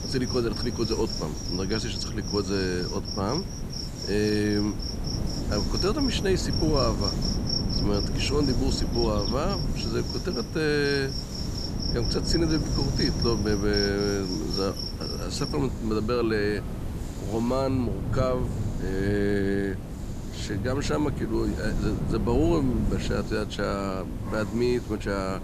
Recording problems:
animal sounds; loud; throughout; 6 dB below the speech
wind noise on the microphone; occasional gusts; 10 dB below the speech
hiss; noticeable; throughout; 20 dB below the speech

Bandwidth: 14.5 kHz